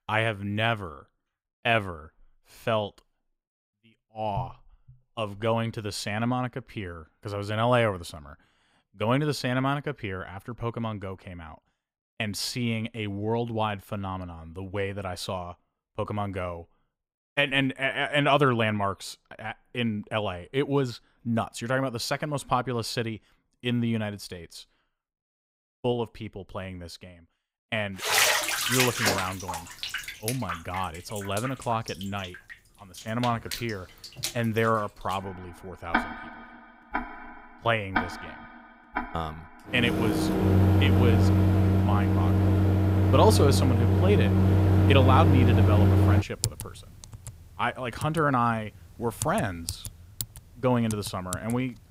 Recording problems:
household noises; very loud; from 28 s on; 4 dB above the speech

